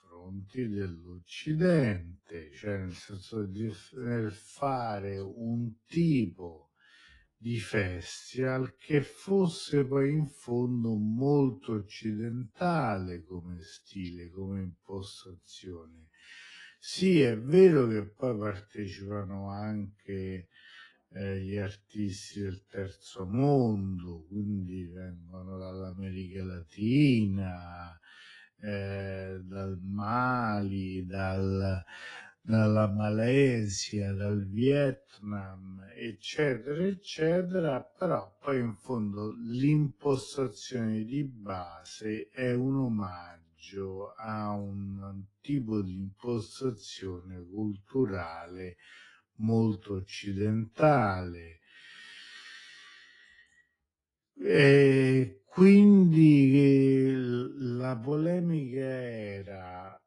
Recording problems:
wrong speed, natural pitch; too slow; 0.5 times normal speed
garbled, watery; slightly; nothing above 10.5 kHz

